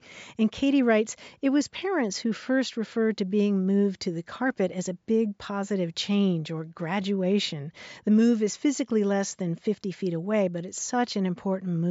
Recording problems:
high frequencies cut off; noticeable; nothing above 7.5 kHz
abrupt cut into speech; at the end

